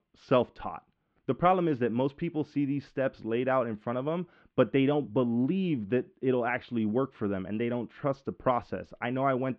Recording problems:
muffled; very; fading above 3 kHz

